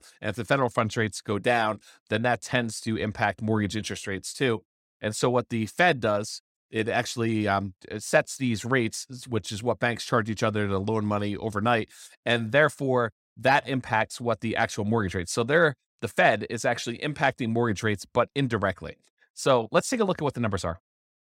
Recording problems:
none

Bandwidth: 16 kHz